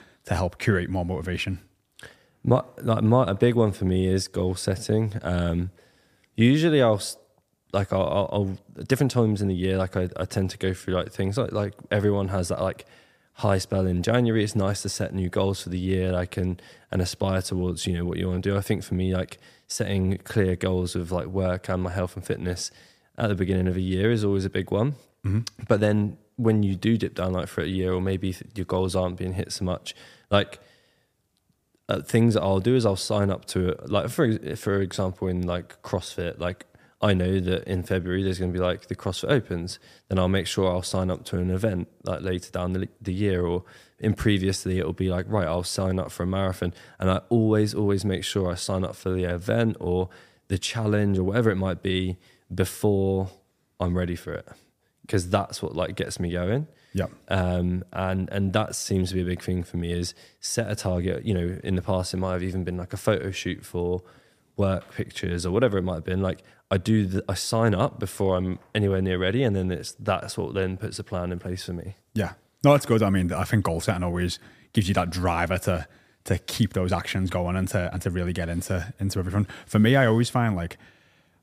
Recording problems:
none

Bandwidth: 15 kHz